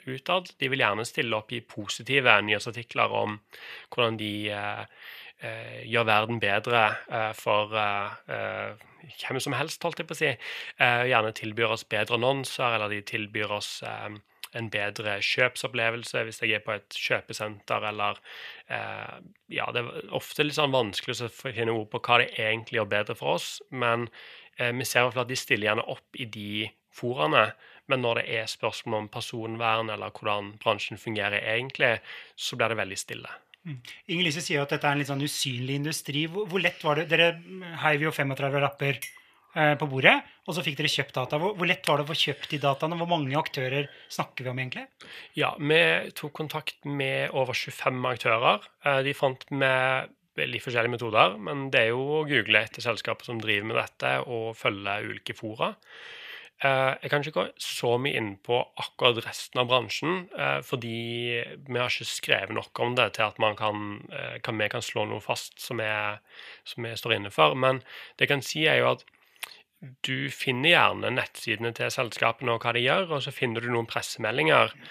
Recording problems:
thin; somewhat; fading below 400 Hz
clattering dishes; faint; at 39 s; peak 15 dB below the speech

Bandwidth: 14.5 kHz